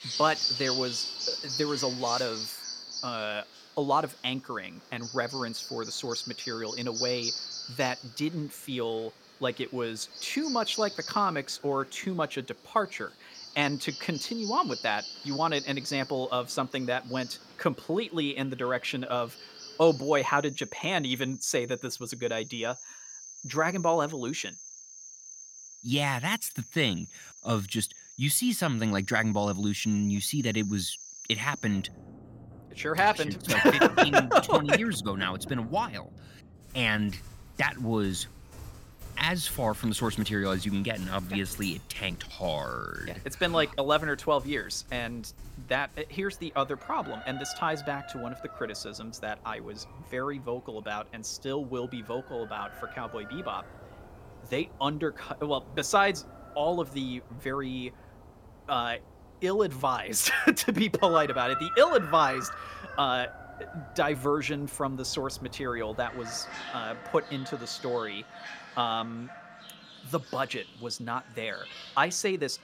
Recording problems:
animal sounds; noticeable; throughout; 10 dB below the speech

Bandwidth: 16.5 kHz